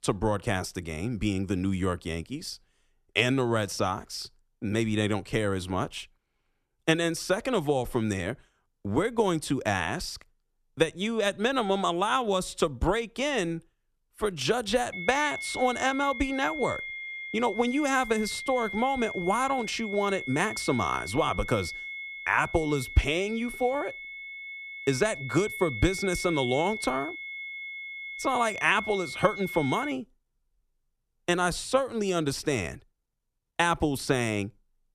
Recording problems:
high-pitched whine; loud; from 15 to 30 s; 2 kHz, 8 dB below the speech

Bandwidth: 14 kHz